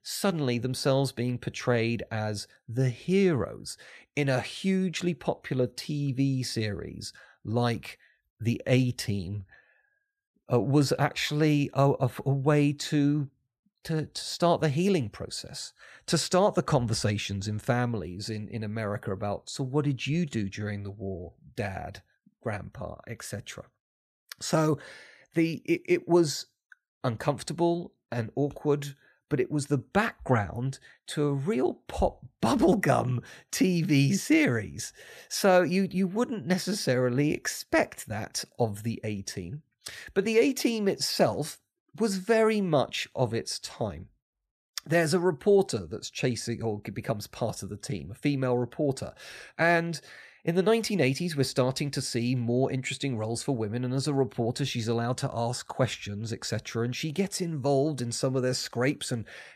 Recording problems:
none

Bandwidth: 14.5 kHz